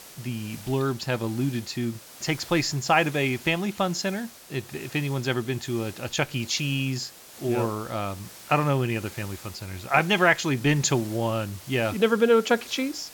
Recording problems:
high frequencies cut off; noticeable; nothing above 8 kHz
hiss; noticeable; throughout; 15 dB below the speech

